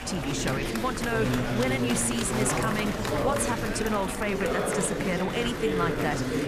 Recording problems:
chatter from many people; very loud; throughout; as loud as the speech
low rumble; faint; throughout; 25 dB below the speech

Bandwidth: 14.5 kHz